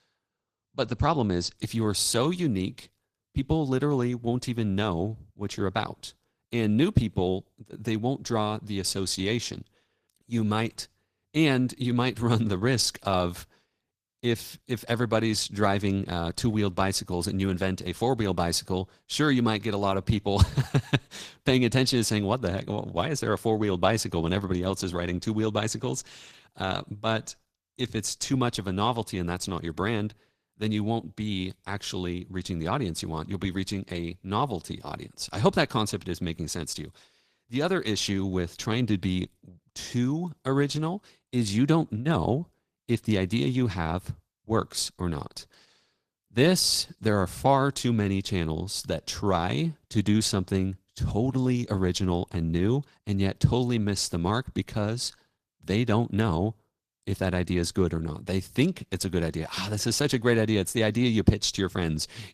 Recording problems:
garbled, watery; slightly; nothing above 14.5 kHz

